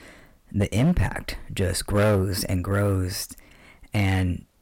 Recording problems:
distortion; slight; 5% of the sound clipped

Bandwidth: 16.5 kHz